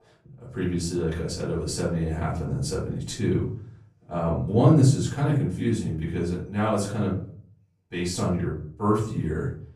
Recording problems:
off-mic speech; far
room echo; noticeable; dies away in 0.5 s

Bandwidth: 15 kHz